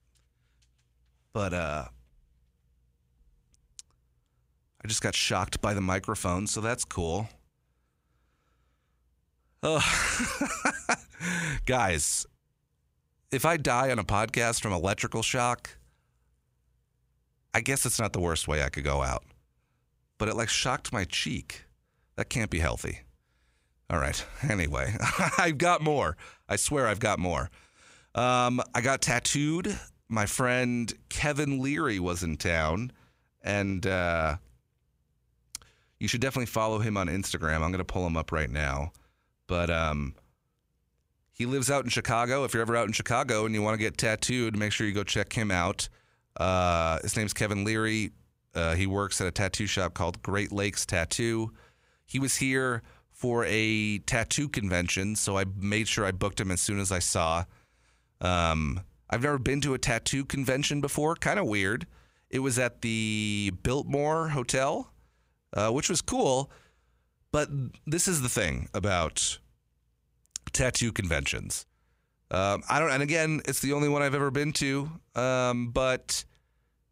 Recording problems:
none

